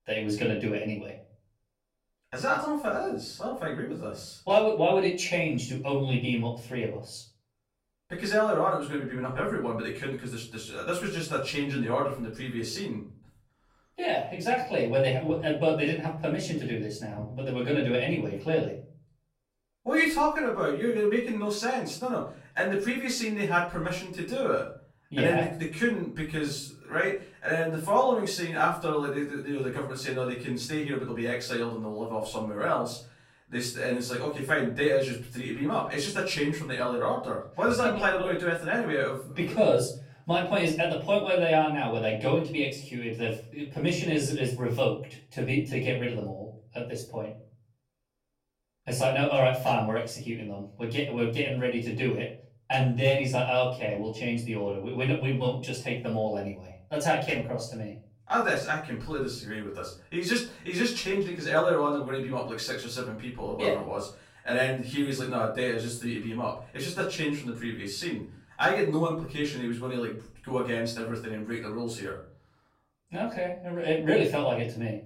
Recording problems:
off-mic speech; far
room echo; slight; dies away in 0.4 s

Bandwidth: 16.5 kHz